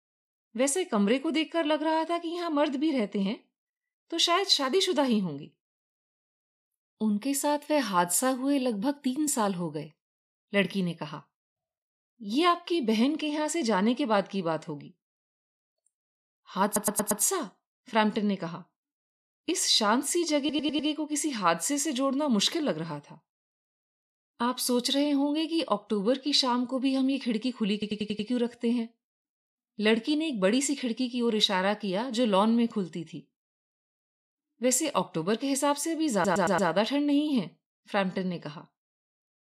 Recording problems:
audio stuttering; 4 times, first at 17 s

